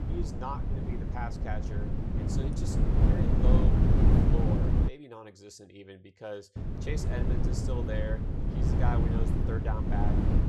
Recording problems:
wind noise on the microphone; heavy; until 5 s and from 6.5 s on; 2 dB above the speech

